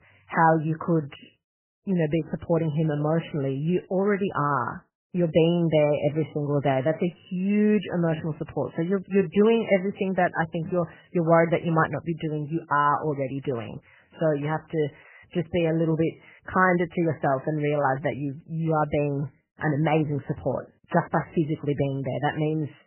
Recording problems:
garbled, watery; badly; nothing above 3 kHz

